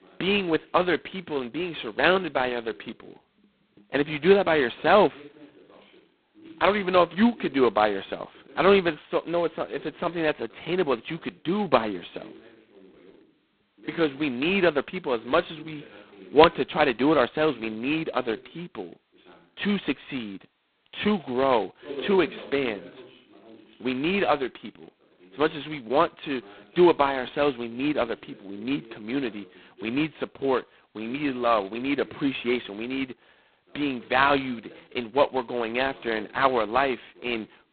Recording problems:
phone-call audio; poor line; nothing above 4 kHz
voice in the background; faint; throughout; 25 dB below the speech

